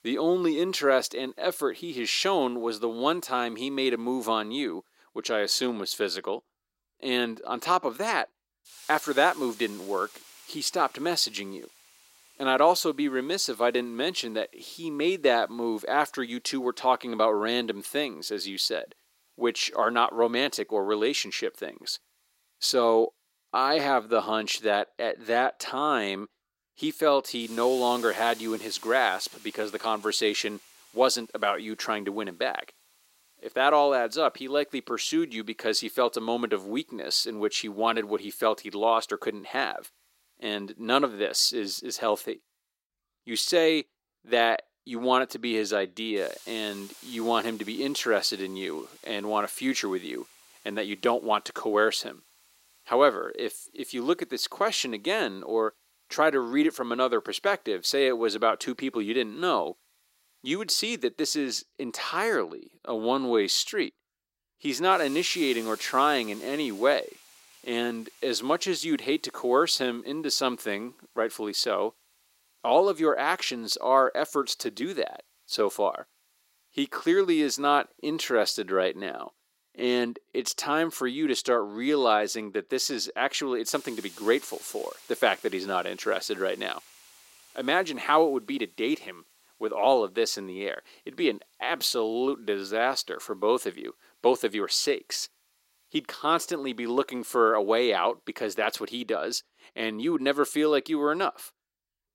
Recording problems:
thin; somewhat; fading below 300 Hz
hiss; faint; throughout; 25 dB below the speech

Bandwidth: 16 kHz